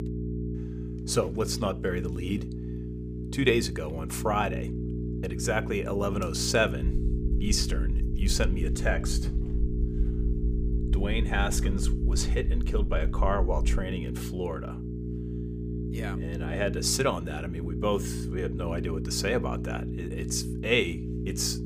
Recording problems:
electrical hum; noticeable; throughout; 60 Hz, 10 dB below the speech
low rumble; faint; from 7 to 14 s; 25 dB below the speech

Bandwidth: 15 kHz